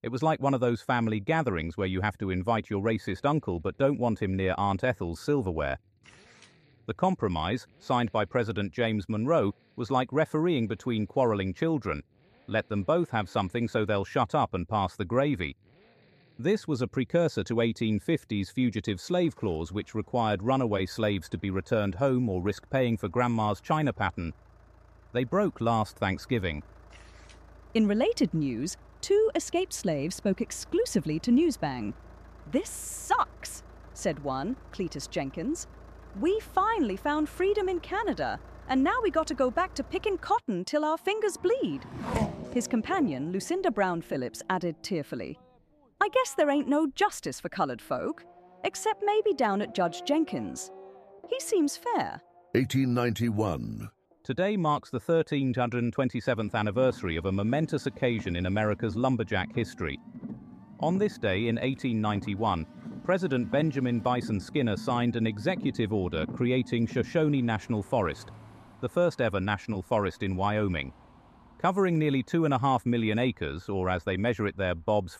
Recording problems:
traffic noise; noticeable; throughout; 15 dB below the speech

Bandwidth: 14.5 kHz